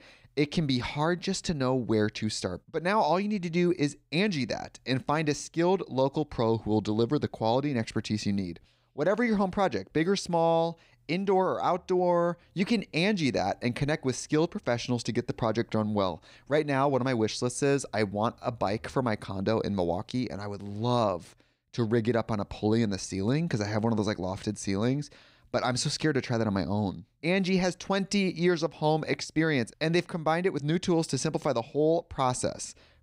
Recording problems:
none

